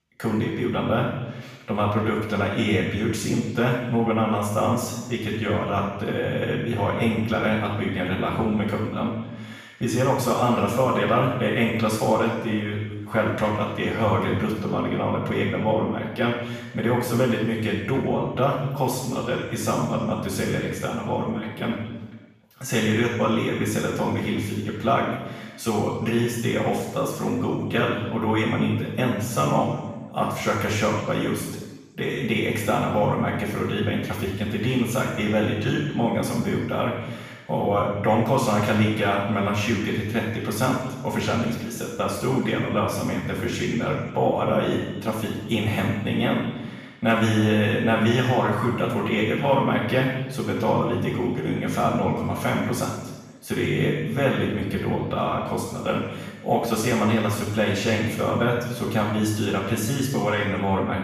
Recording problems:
room echo; strong; dies away in 1.1 s
off-mic speech; far

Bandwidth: 14.5 kHz